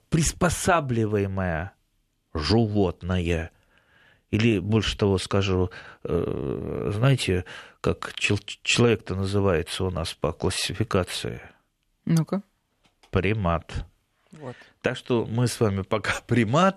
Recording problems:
none

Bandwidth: 13.5 kHz